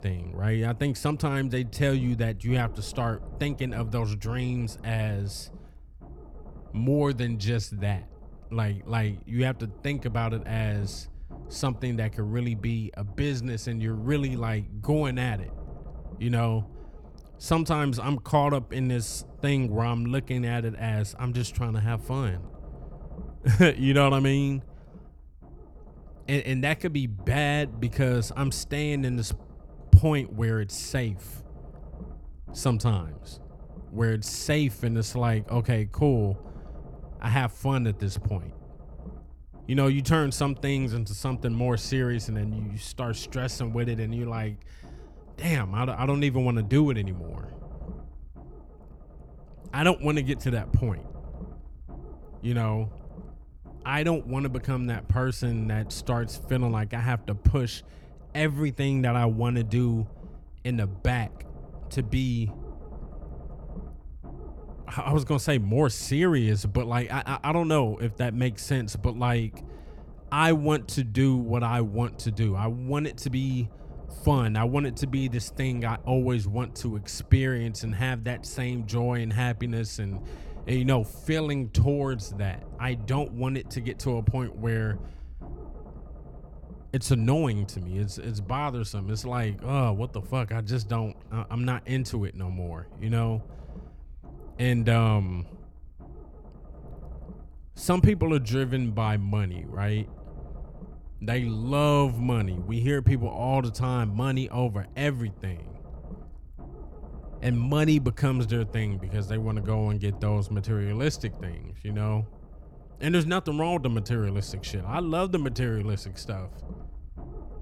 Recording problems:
low rumble; faint; throughout; 20 dB below the speech

